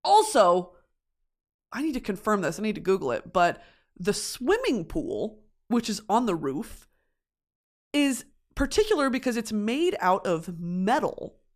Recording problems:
none

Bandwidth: 14.5 kHz